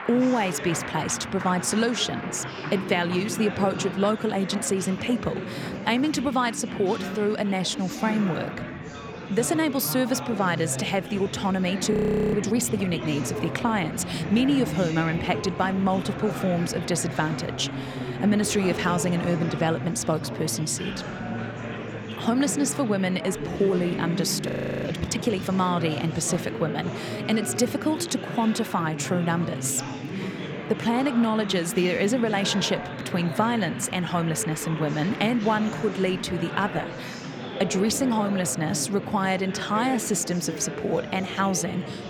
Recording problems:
chatter from many people; loud; throughout; 7 dB below the speech
audio freezing; at 12 s and at 24 s

